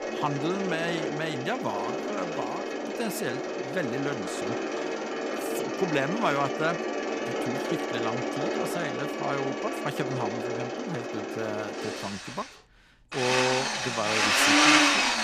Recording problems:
machinery noise; very loud; throughout; 5 dB above the speech
siren; noticeable; from 2.5 to 10 s; peak 9 dB below the speech

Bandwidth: 15 kHz